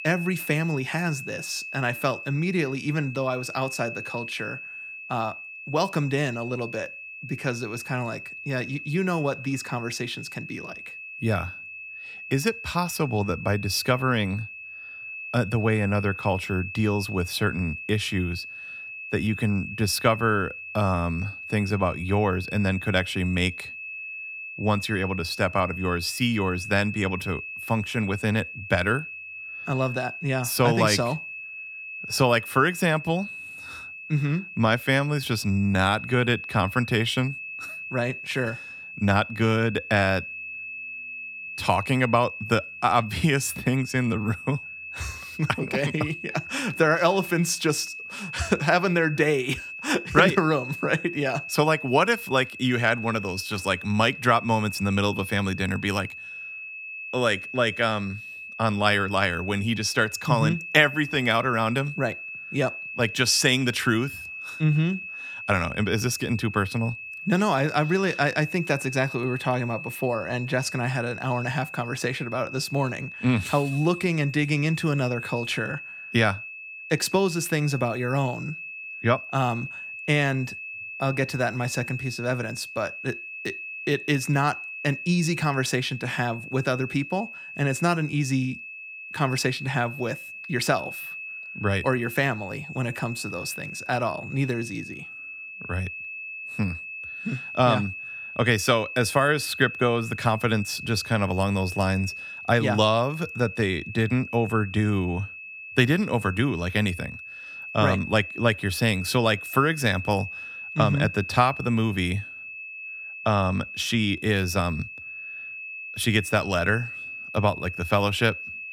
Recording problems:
high-pitched whine; noticeable; throughout; 2.5 kHz, 10 dB below the speech

